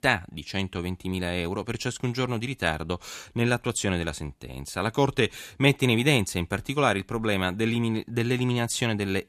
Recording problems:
none

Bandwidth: 14 kHz